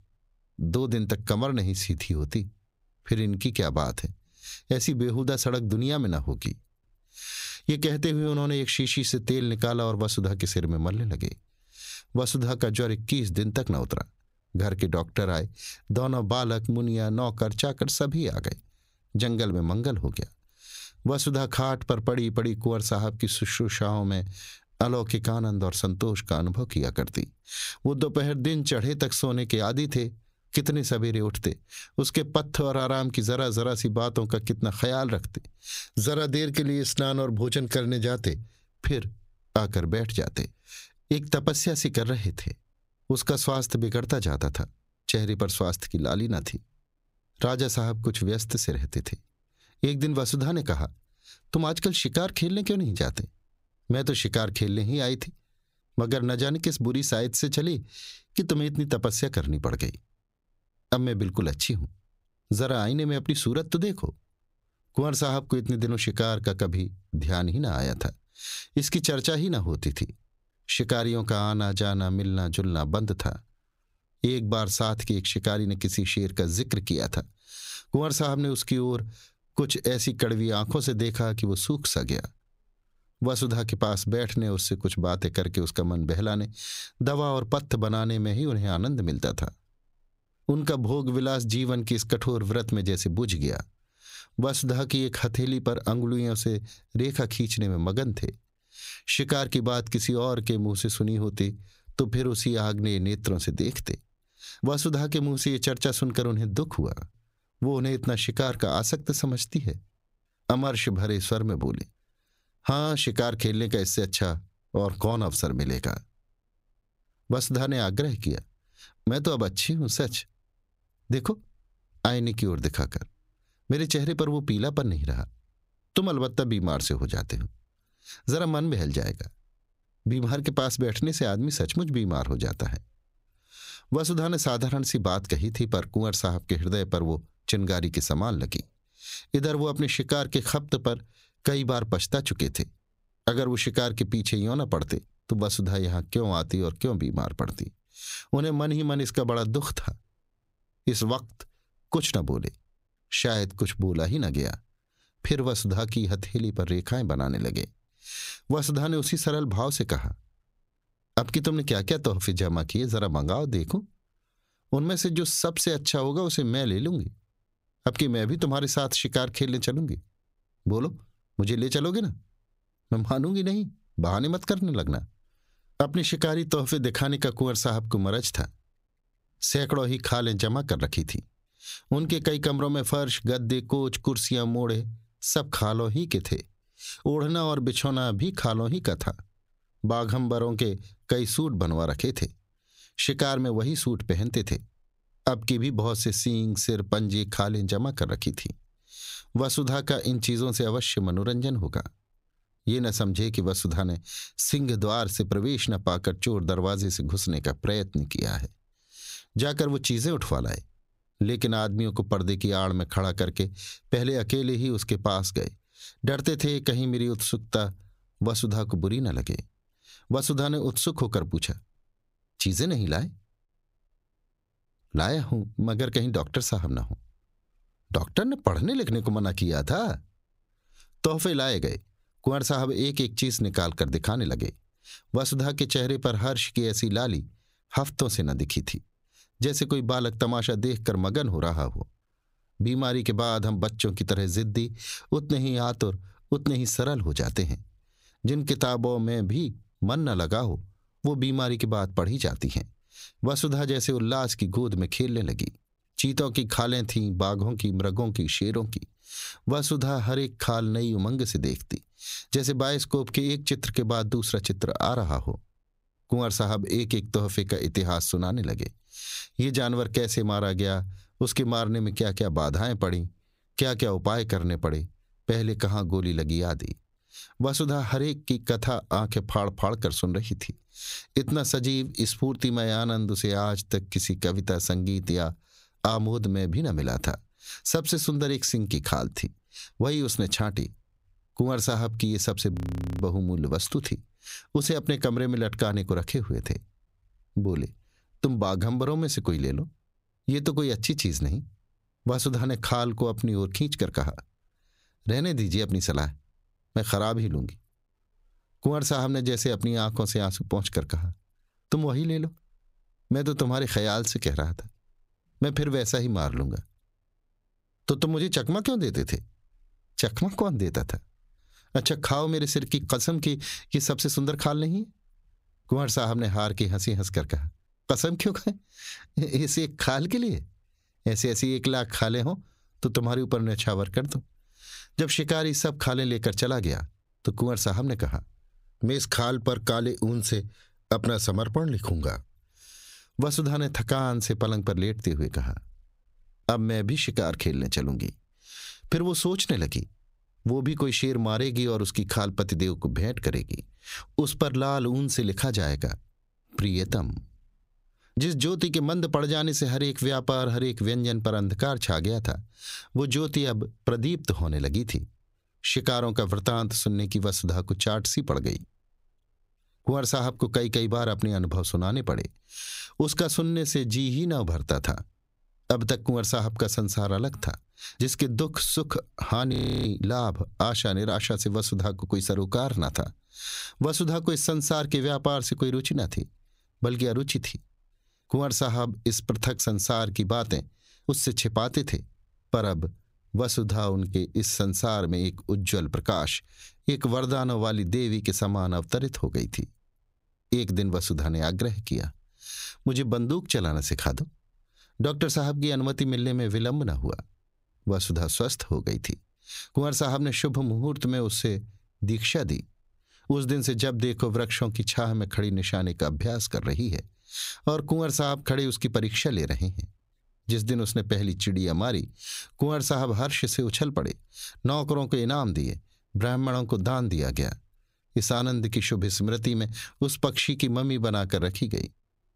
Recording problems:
squashed, flat; heavily
audio freezing; at 4:53 and at 6:20

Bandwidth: 15.5 kHz